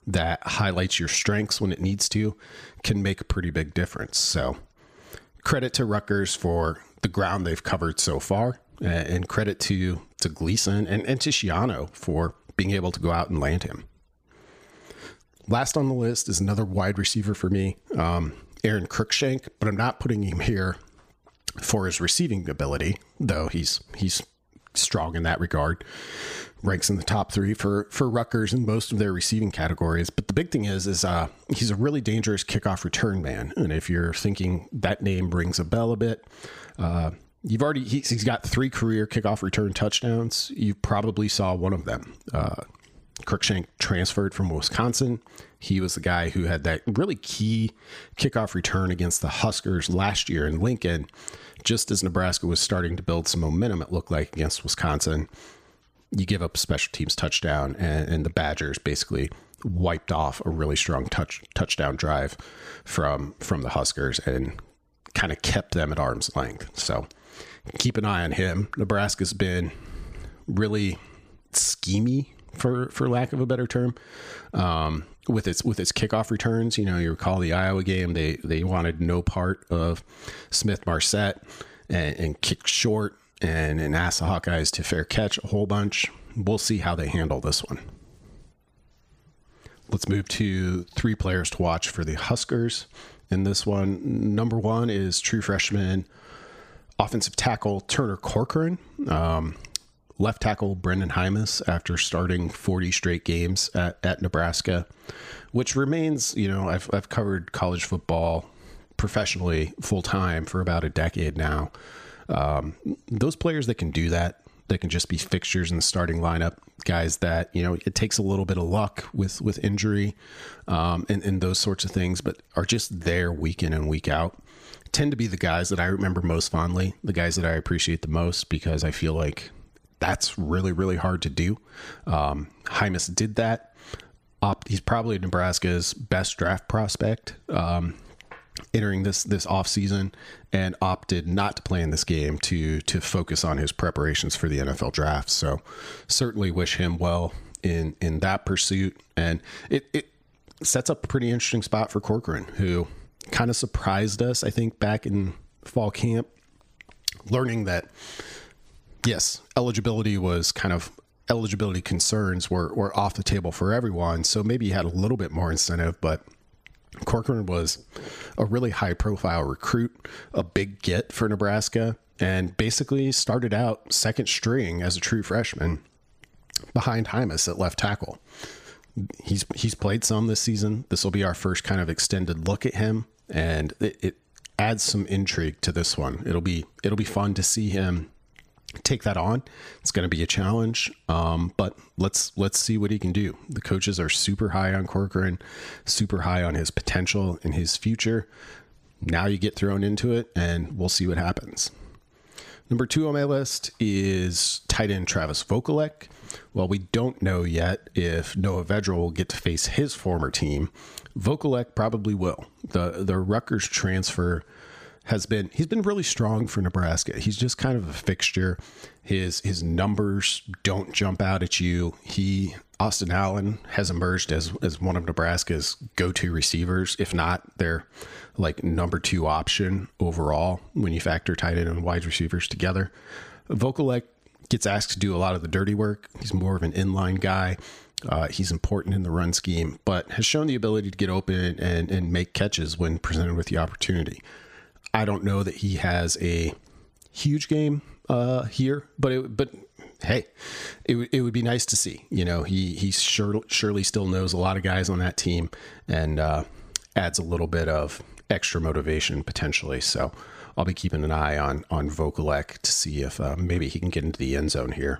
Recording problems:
squashed, flat; somewhat

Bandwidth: 15 kHz